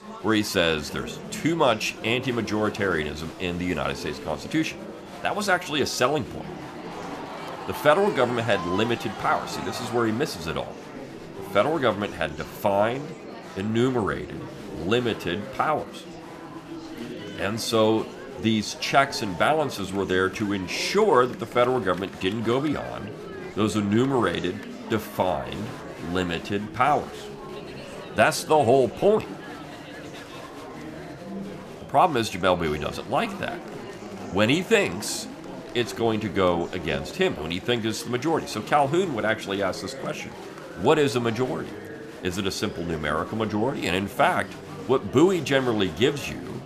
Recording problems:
murmuring crowd; noticeable; throughout; 15 dB below the speech

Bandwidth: 14.5 kHz